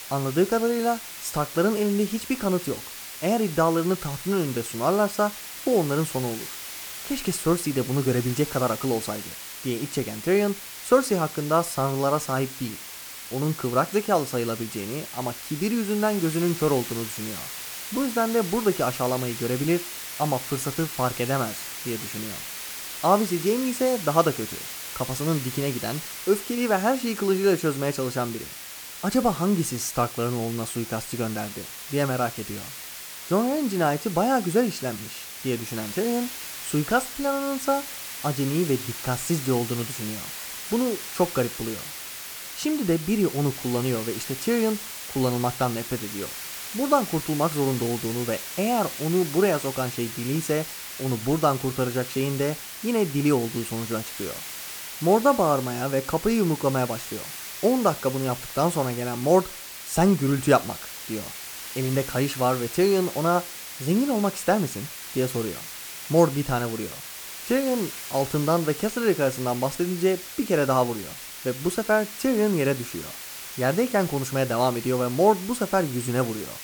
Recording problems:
hiss; loud; throughout; 9 dB below the speech

